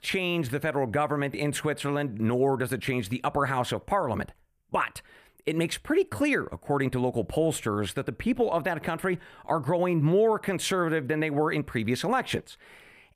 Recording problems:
none

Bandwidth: 15 kHz